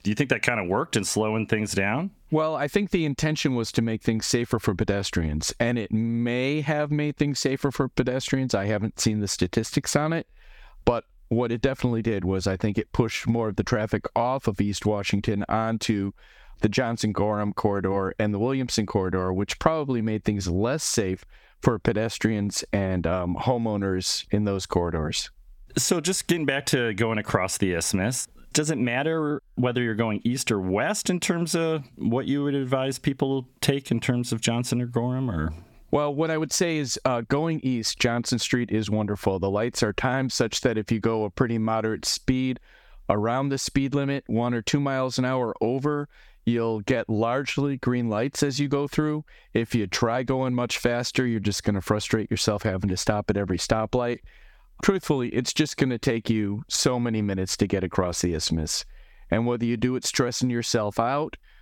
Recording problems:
squashed, flat; somewhat

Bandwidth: 17.5 kHz